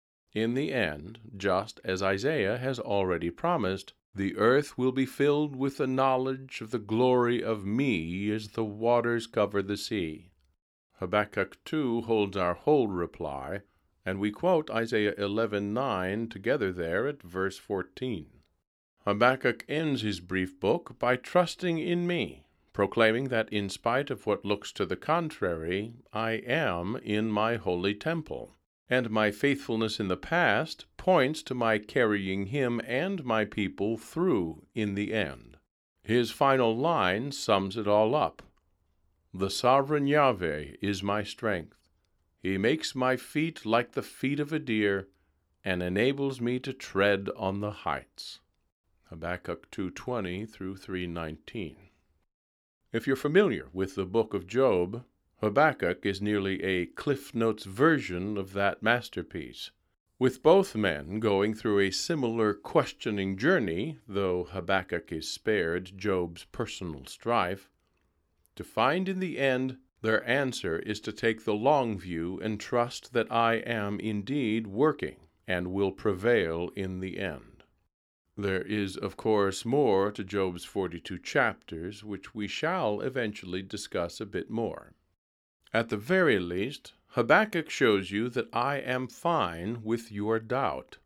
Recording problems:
uneven, jittery; strongly; from 14 s to 1:19

